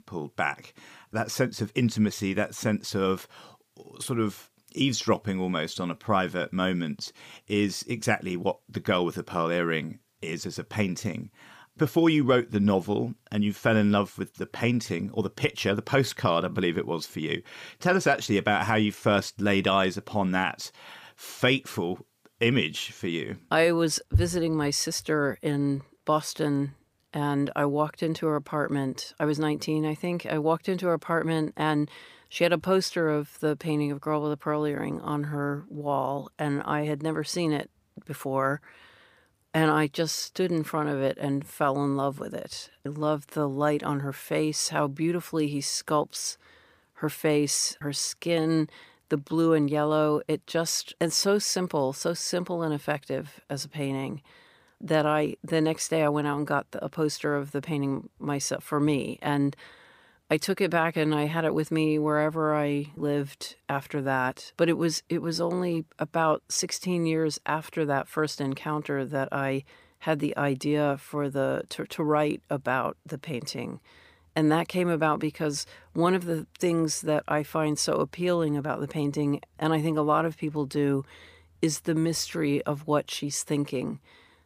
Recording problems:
none

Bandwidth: 15 kHz